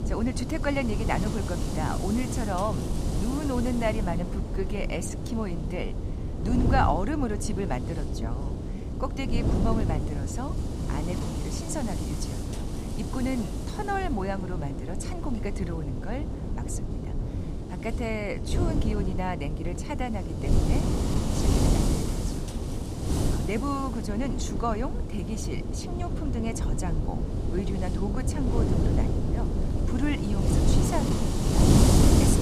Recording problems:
wind noise on the microphone; heavy; 2 dB below the speech

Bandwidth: 15 kHz